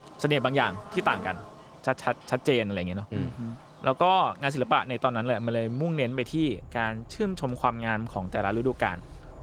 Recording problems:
garbled, watery; slightly; nothing above 18.5 kHz
animal sounds; noticeable; throughout; 20 dB below the speech

